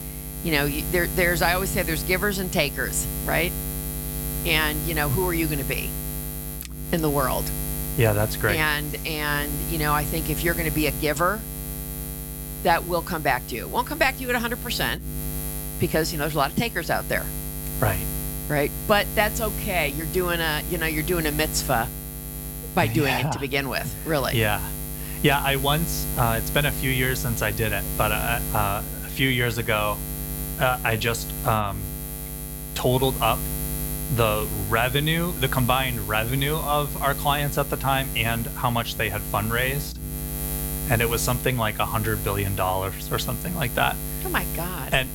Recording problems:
electrical hum; noticeable; throughout; 60 Hz, 10 dB below the speech

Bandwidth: 17.5 kHz